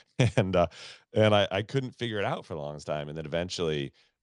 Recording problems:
none

